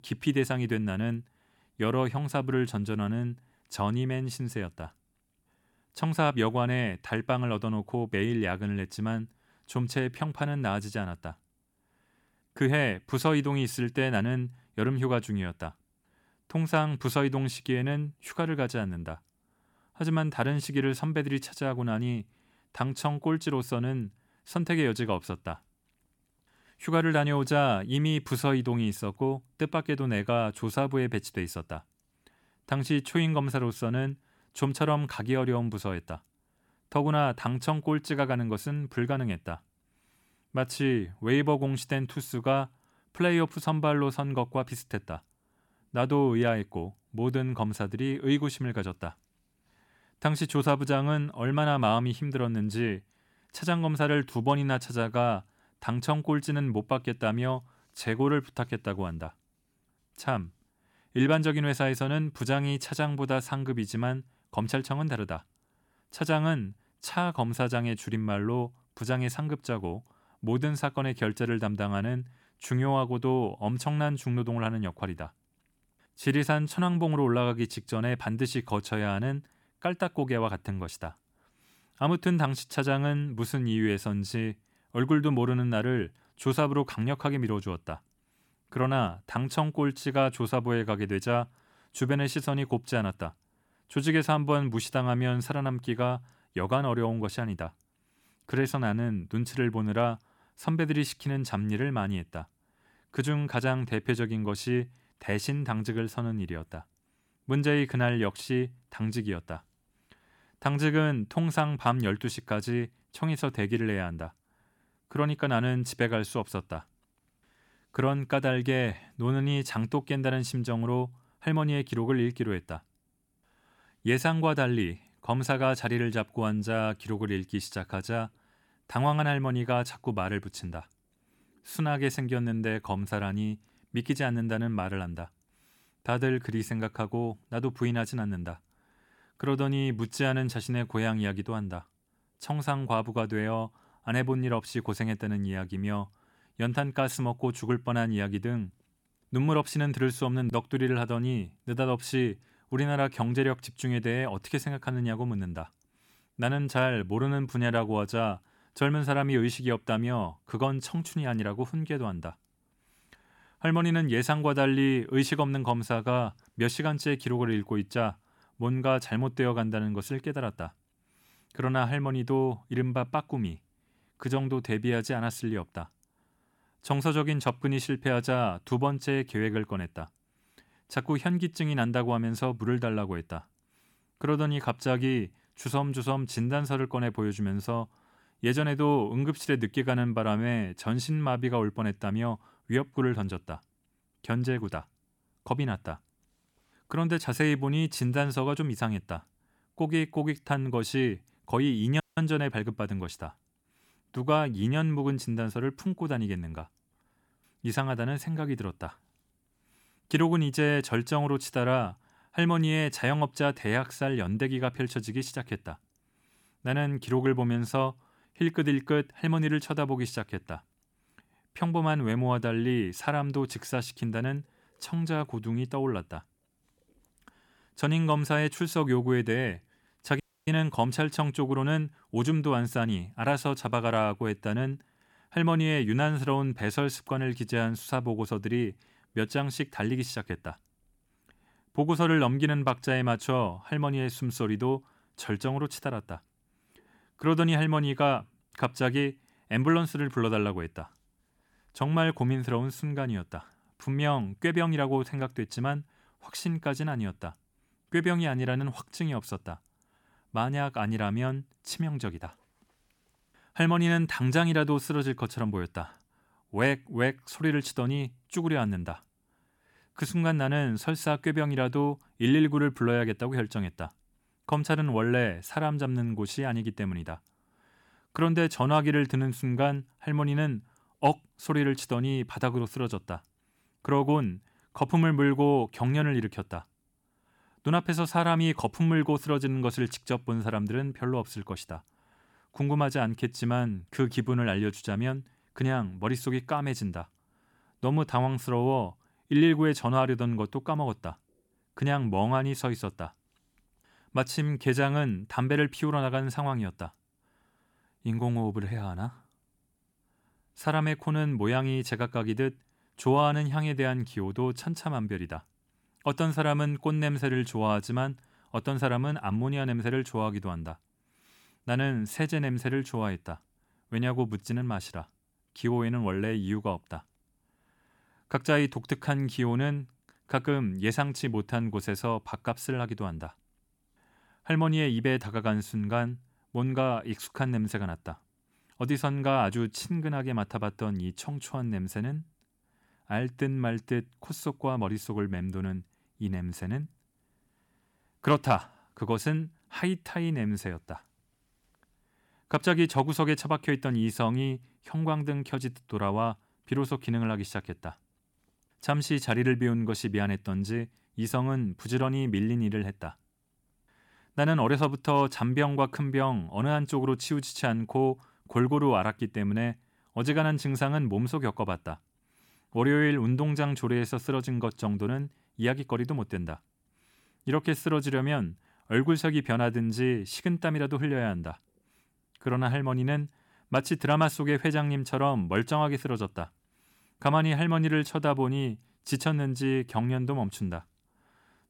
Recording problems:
audio cutting out; at 3:22 and at 3:50

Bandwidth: 18 kHz